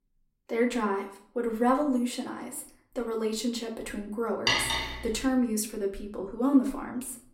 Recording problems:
room echo; slight; dies away in 0.5 s
off-mic speech; somewhat distant
clattering dishes; loud; at 4.5 s; peak 5 dB above the speech

